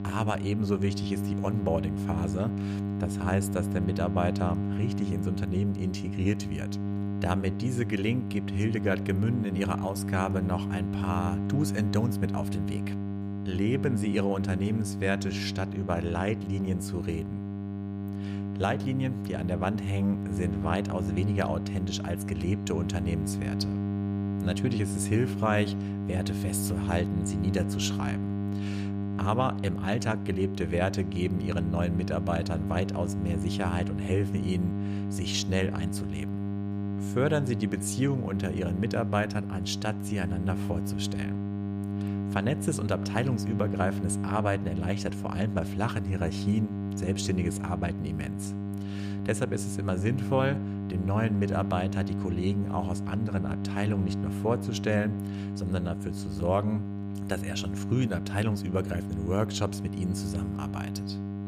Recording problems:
electrical hum; loud; throughout; 50 Hz, 6 dB below the speech

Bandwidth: 14.5 kHz